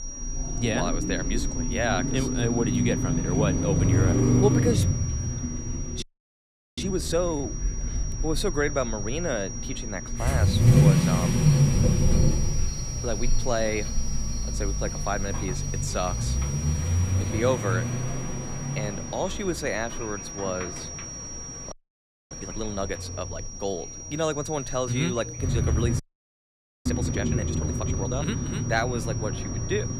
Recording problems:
traffic noise; very loud; throughout; 4 dB above the speech
high-pitched whine; loud; throughout; 5.5 kHz, 6 dB below the speech
animal sounds; noticeable; throughout; 10 dB below the speech
murmuring crowd; faint; throughout; 25 dB below the speech
audio freezing; at 6 s for 1 s, at 22 s for 0.5 s and at 26 s for 1 s

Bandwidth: 15 kHz